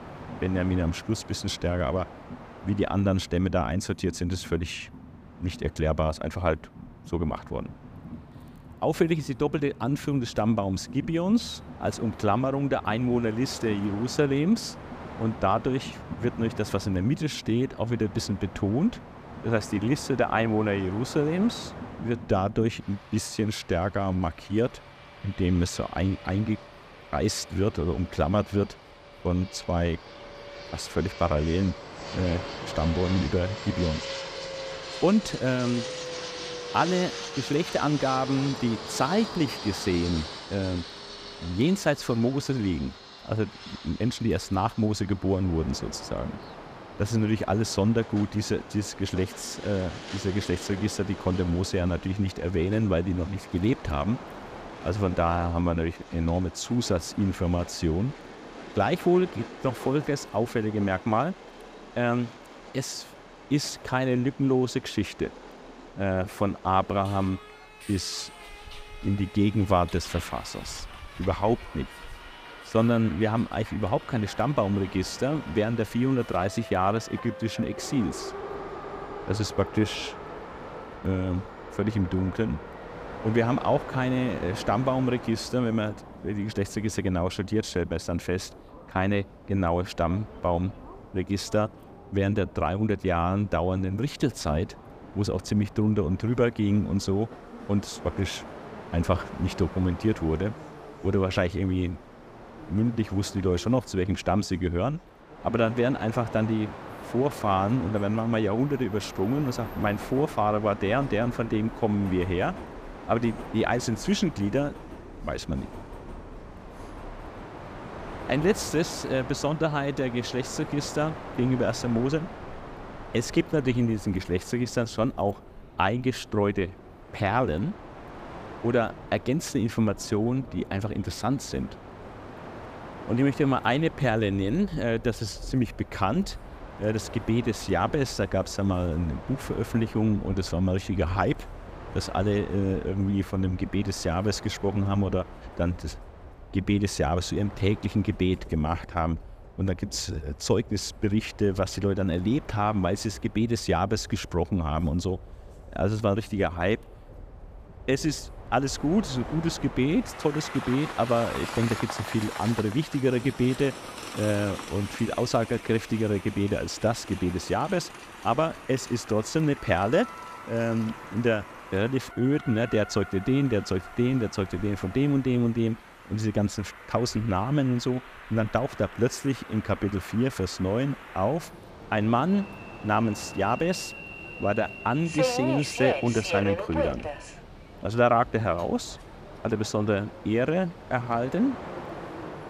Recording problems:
train or aircraft noise; noticeable; throughout; 15 dB below the speech

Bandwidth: 15 kHz